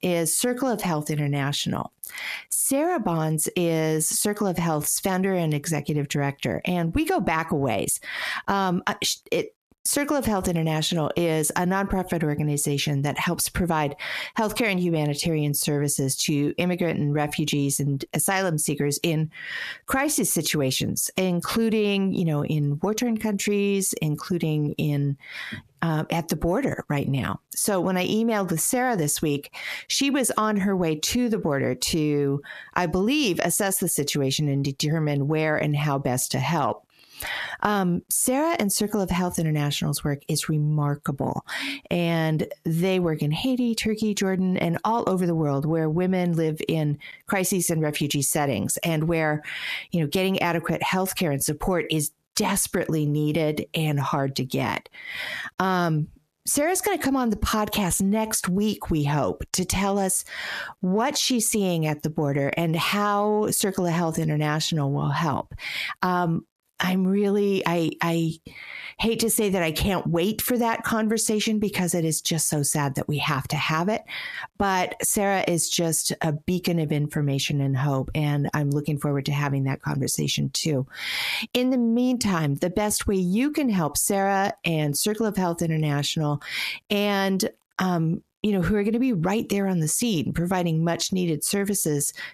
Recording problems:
squashed, flat; heavily

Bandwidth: 14.5 kHz